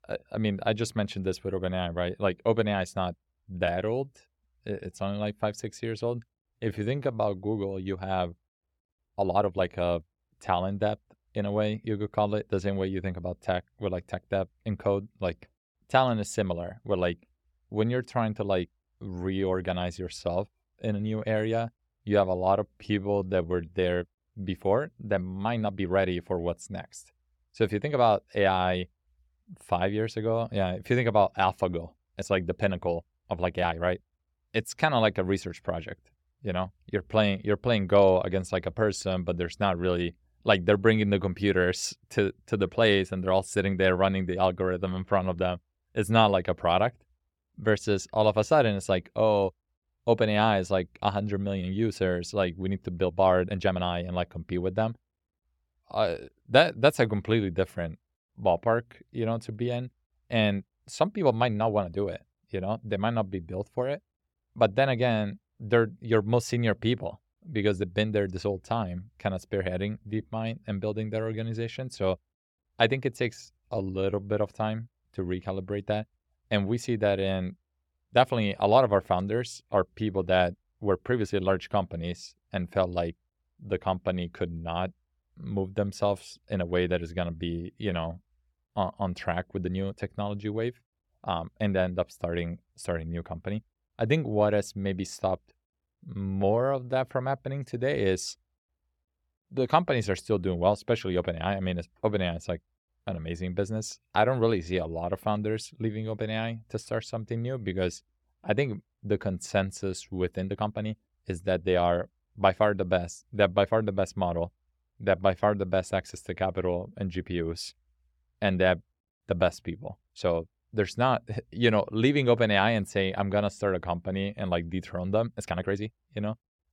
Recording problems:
uneven, jittery; strongly; from 3 s to 2:06

